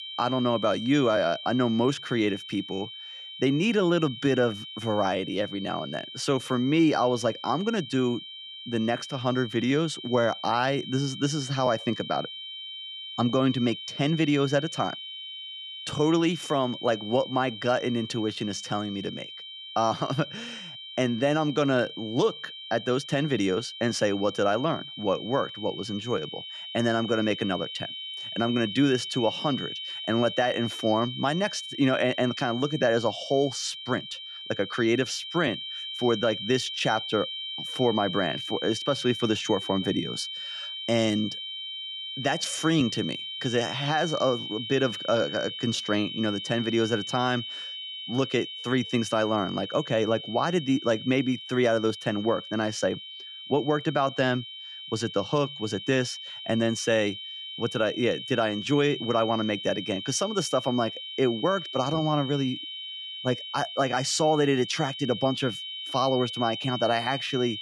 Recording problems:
high-pitched whine; loud; throughout; 3 kHz, 9 dB below the speech

